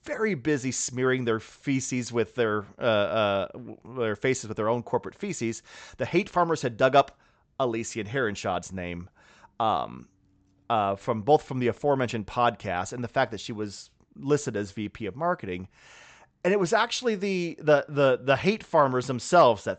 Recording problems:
high frequencies cut off; noticeable; nothing above 8 kHz

